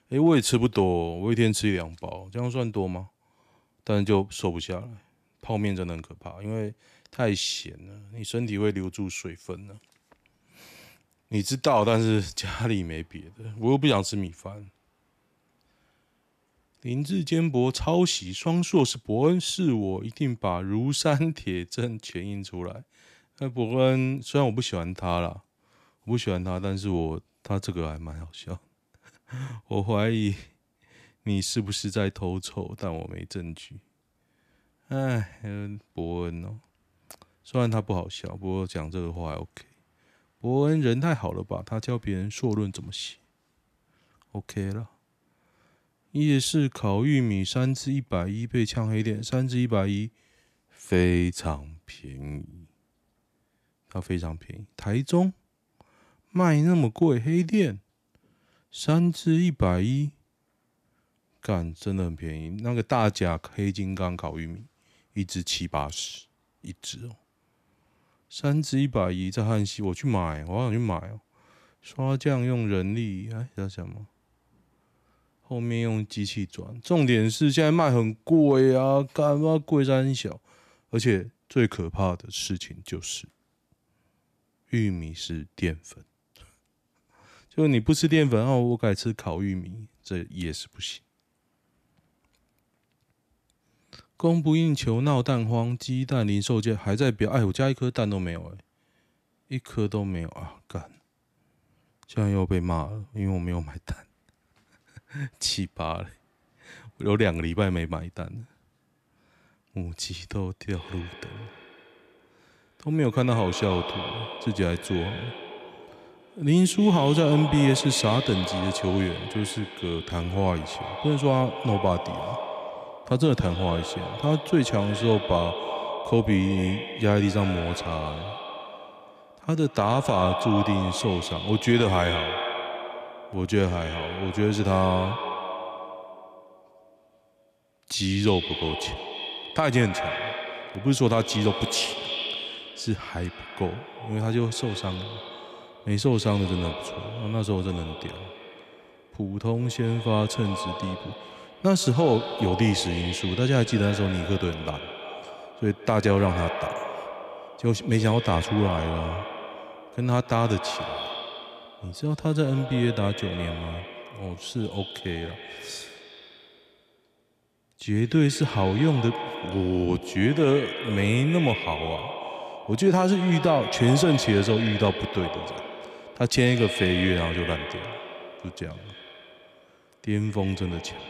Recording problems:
echo of what is said; strong; from 1:51 on; 140 ms later, 8 dB below the speech

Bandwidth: 14.5 kHz